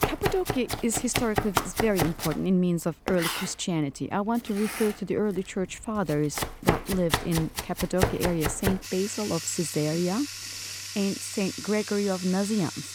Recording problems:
household noises; loud; throughout; 3 dB below the speech

